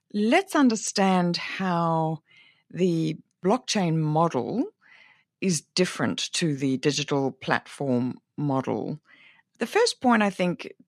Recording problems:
none

